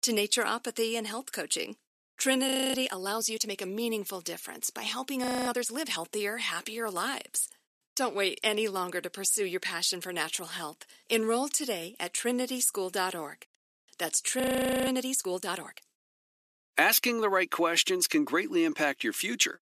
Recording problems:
thin; very slightly; fading below 300 Hz
audio freezing; at 2.5 s, at 5 s and at 14 s

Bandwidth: 14.5 kHz